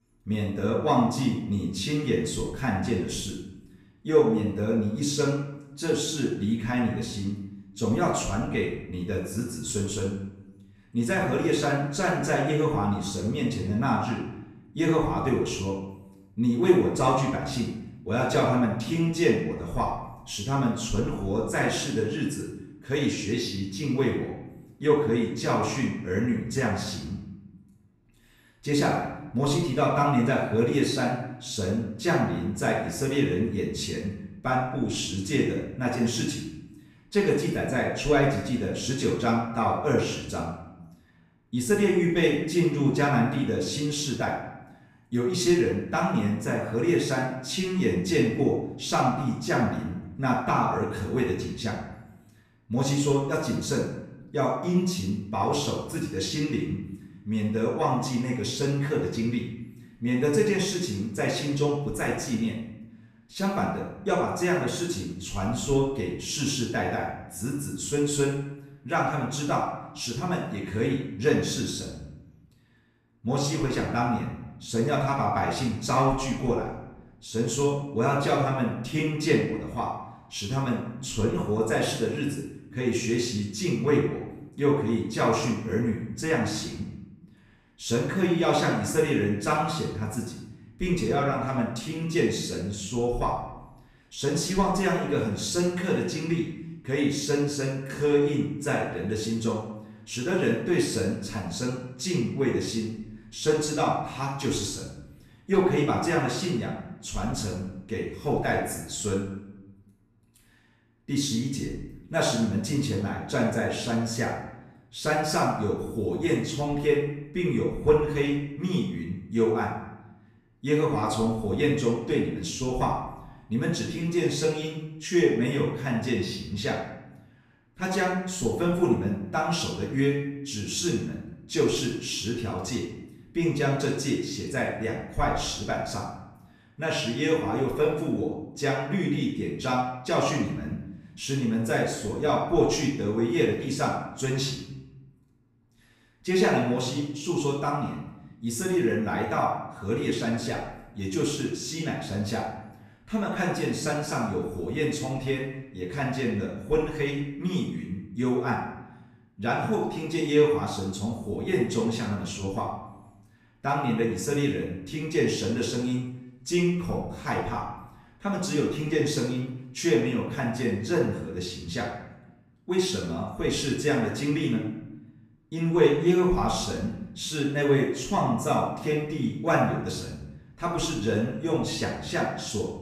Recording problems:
off-mic speech; far
room echo; noticeable; dies away in 0.8 s

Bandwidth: 14.5 kHz